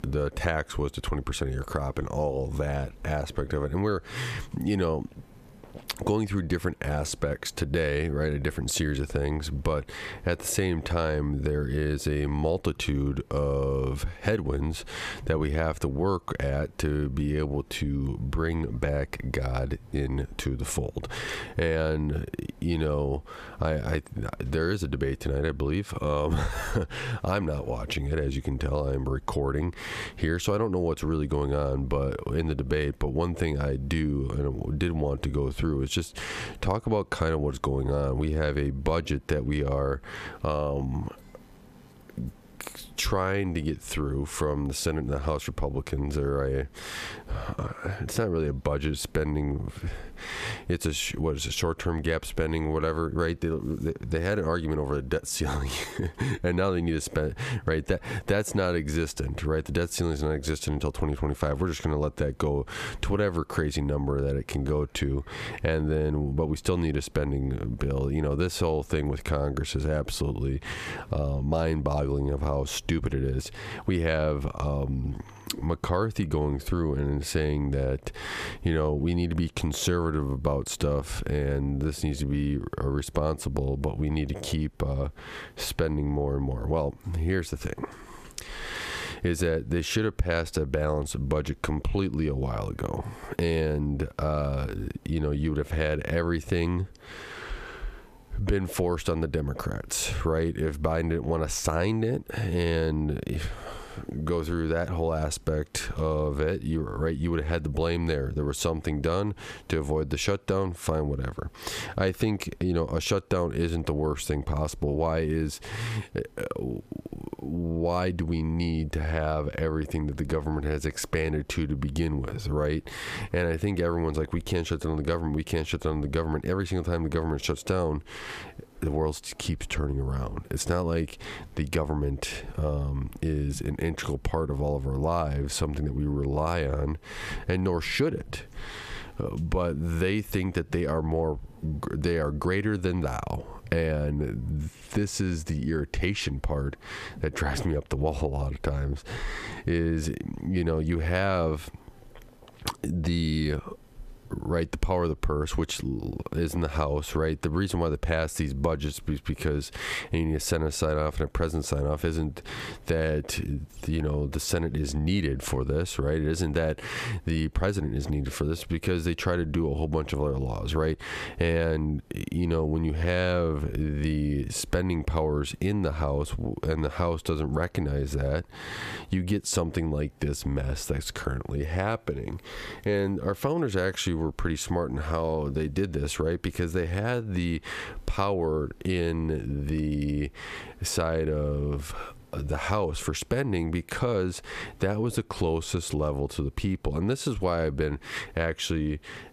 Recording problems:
squashed, flat; heavily

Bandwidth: 14.5 kHz